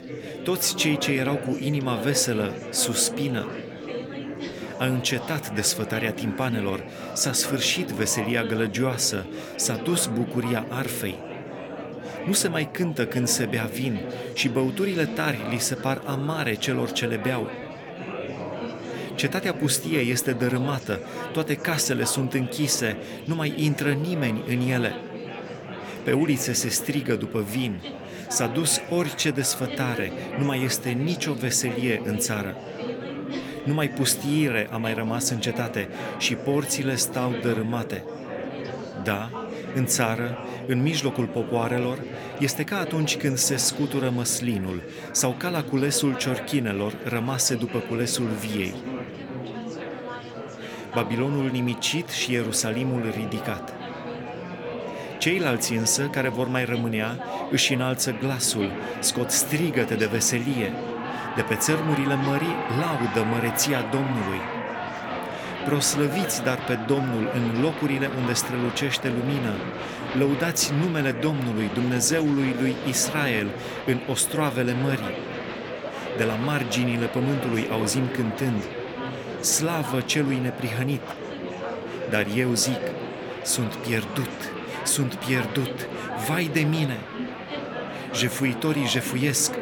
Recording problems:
murmuring crowd; loud; throughout; 8 dB below the speech

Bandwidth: 18.5 kHz